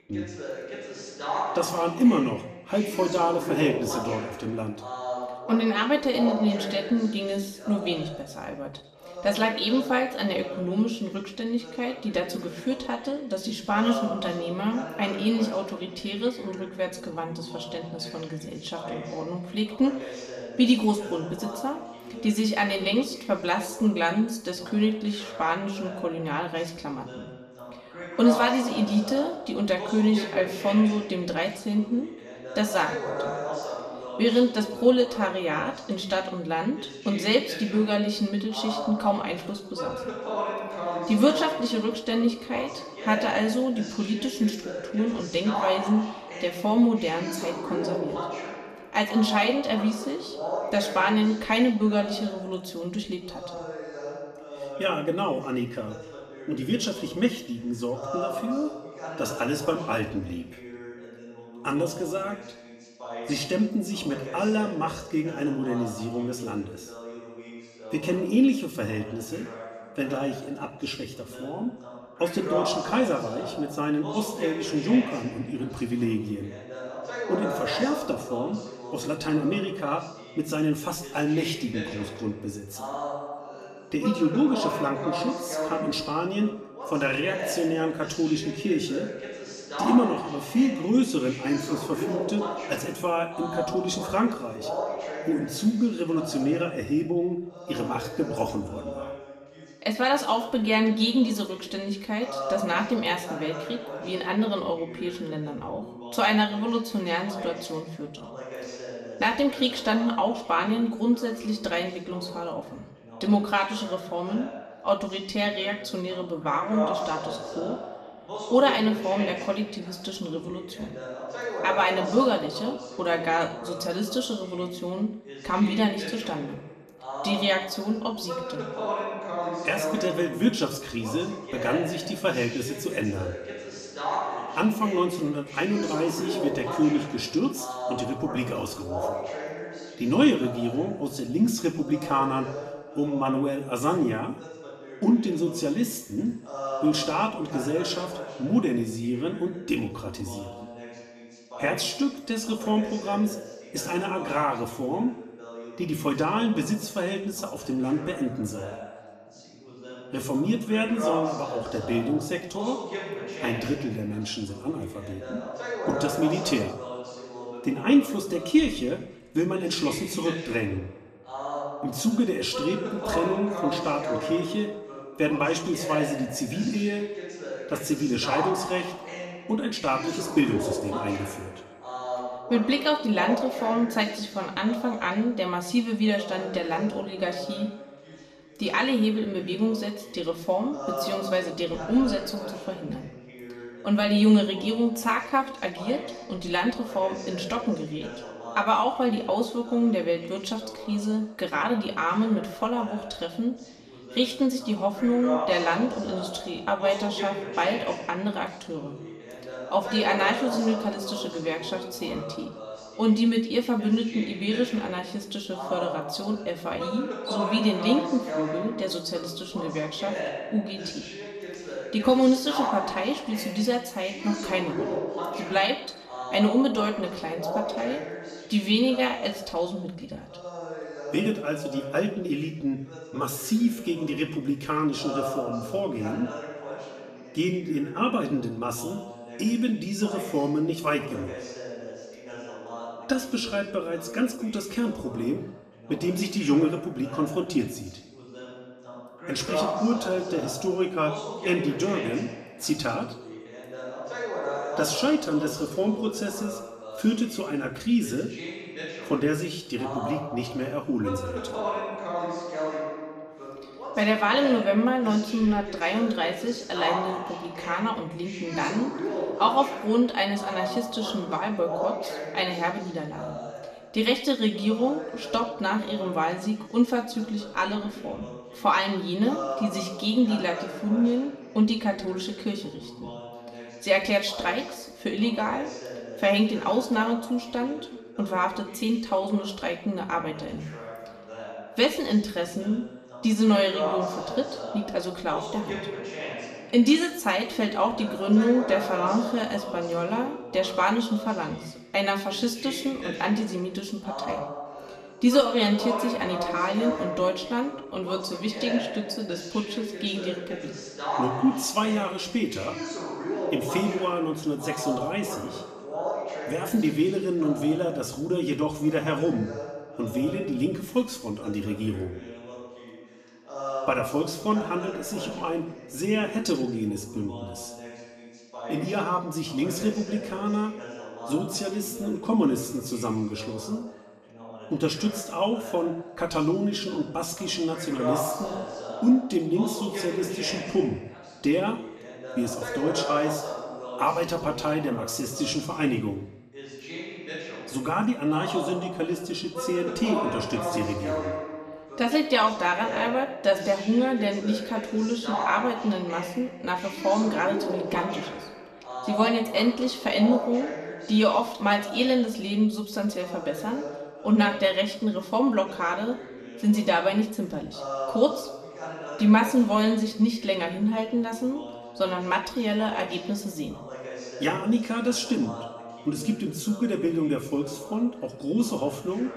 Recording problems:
room echo; slight; dies away in 0.7 s
off-mic speech; somewhat distant
voice in the background; loud; throughout; 9 dB below the speech

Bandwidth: 14.5 kHz